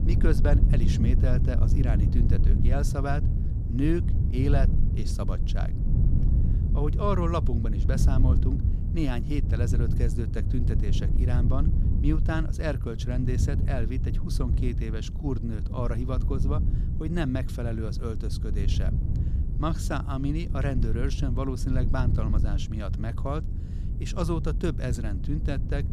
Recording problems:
wind noise on the microphone; heavy; 6 dB below the speech

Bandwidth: 15 kHz